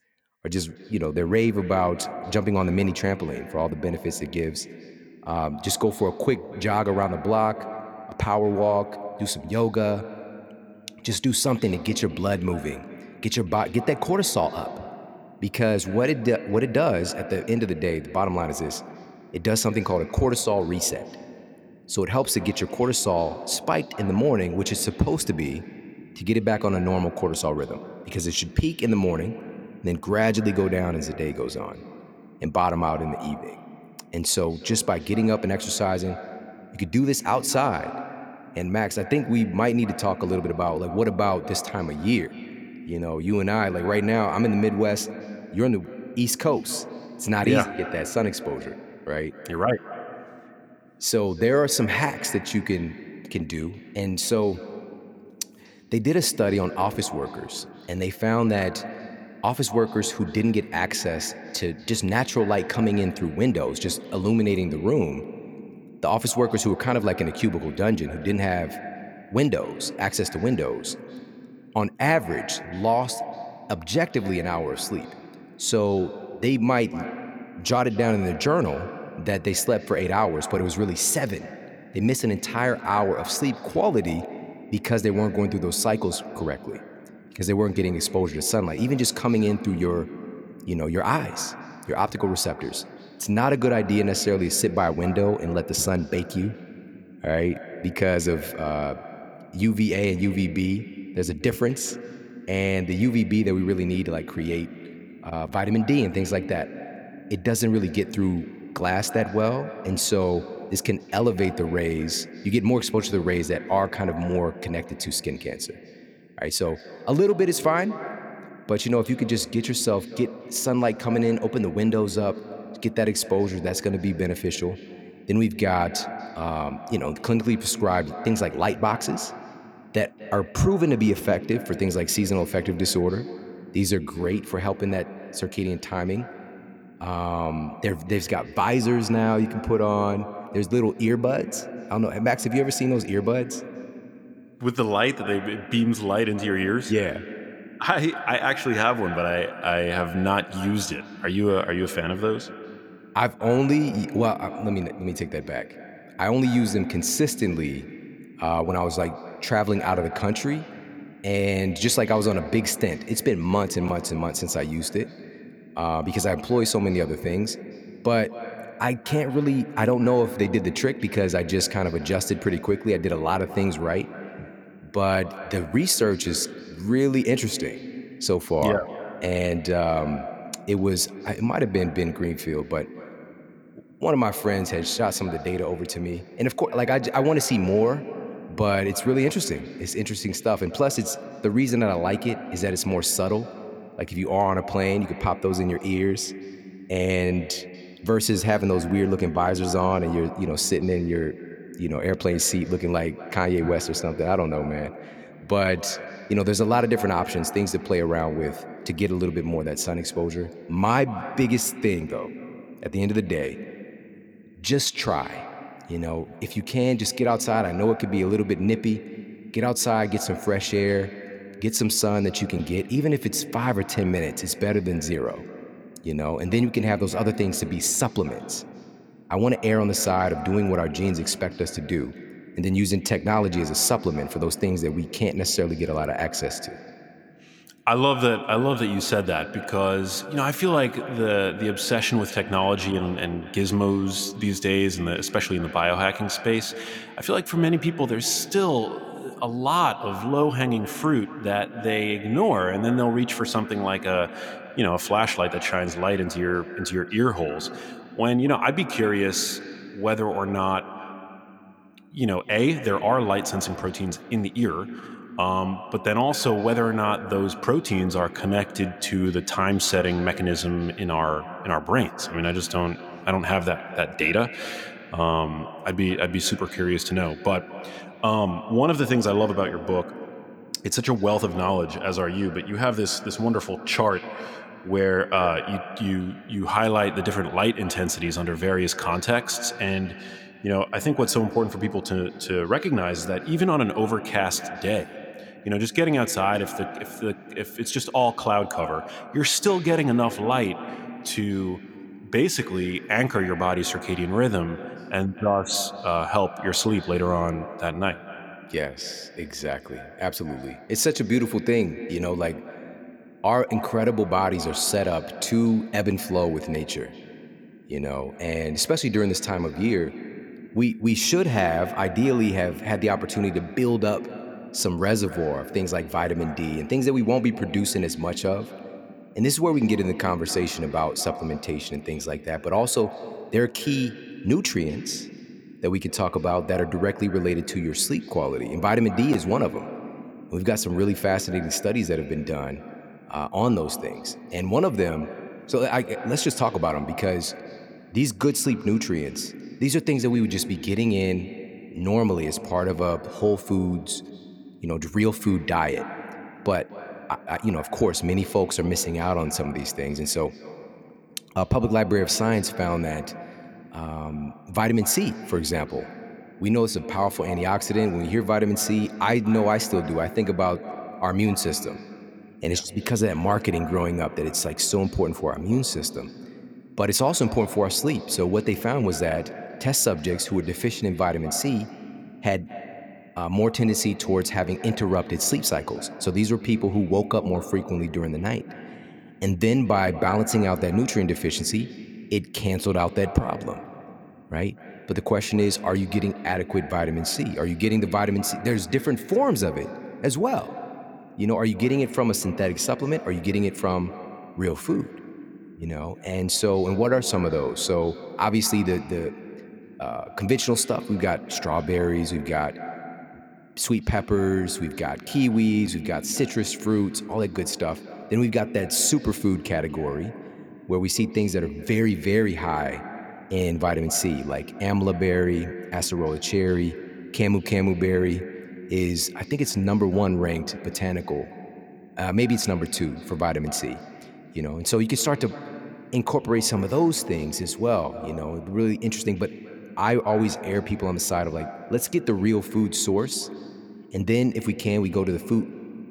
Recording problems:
echo of what is said; noticeable; throughout; 240 ms later, 15 dB below the speech

